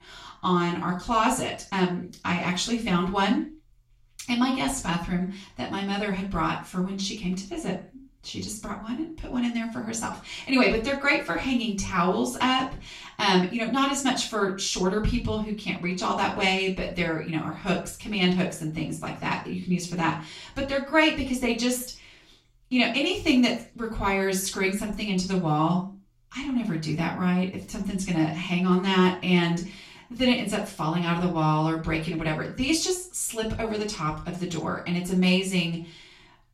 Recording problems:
off-mic speech; far
room echo; slight; dies away in 0.3 s

